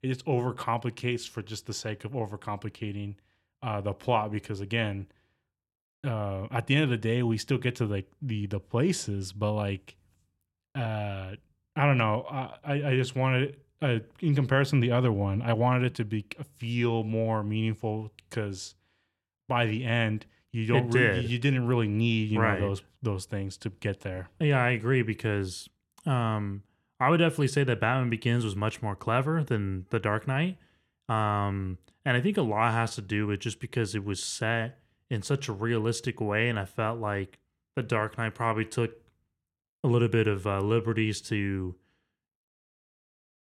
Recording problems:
none

